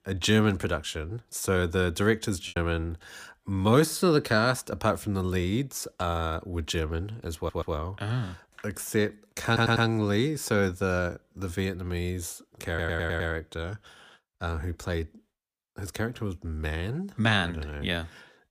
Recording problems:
choppy; occasionally; at 2.5 s; 2% of the speech affected
audio stuttering; at 7.5 s, at 9.5 s and at 13 s

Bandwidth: 15 kHz